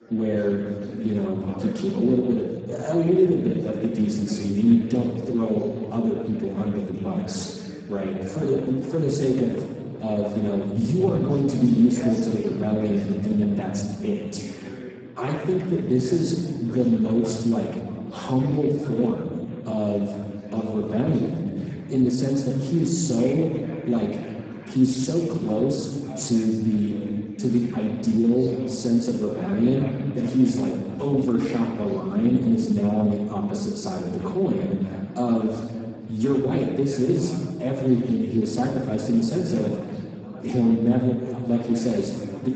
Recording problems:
off-mic speech; far
garbled, watery; badly; nothing above 7.5 kHz
room echo; noticeable; dies away in 1.6 s
background chatter; noticeable; throughout; 4 voices, 15 dB below the speech

